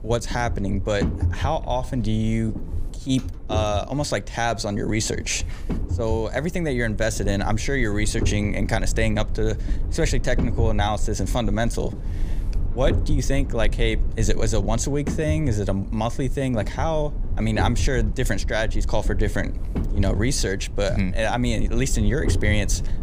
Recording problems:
low rumble; noticeable; throughout; 15 dB below the speech

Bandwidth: 15 kHz